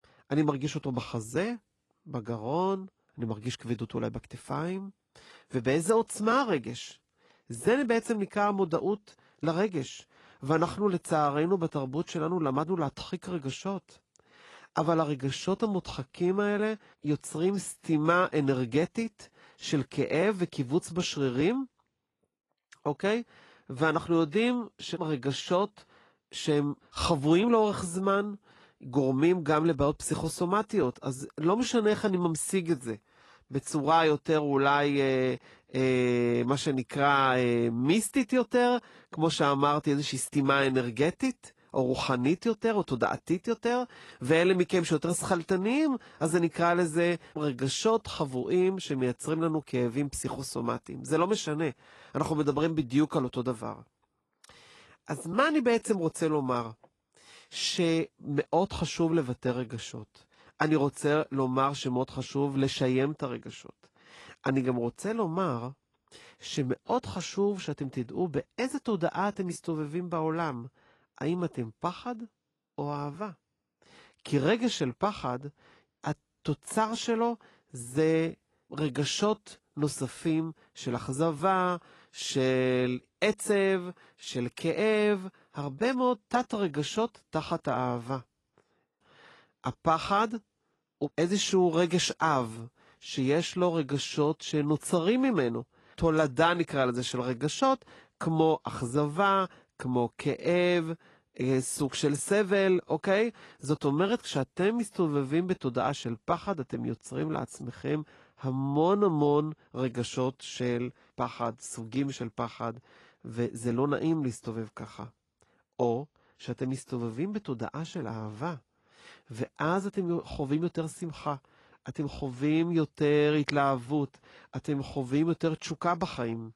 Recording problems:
garbled, watery; slightly

